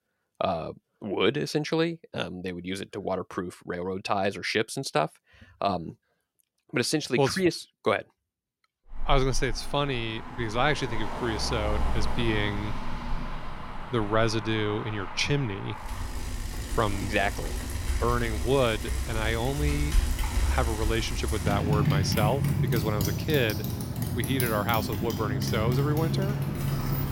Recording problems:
traffic noise; loud; from 9 s on; 3 dB below the speech

